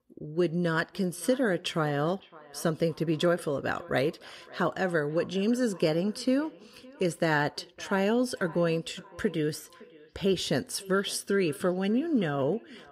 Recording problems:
echo of what is said; faint; throughout; 560 ms later, 20 dB below the speech

